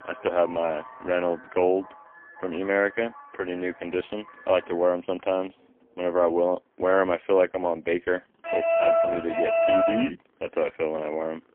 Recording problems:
phone-call audio; poor line; nothing above 3 kHz
traffic noise; noticeable; throughout; 20 dB below the speech
alarm; loud; from 8.5 to 10 s; peak 6 dB above the speech

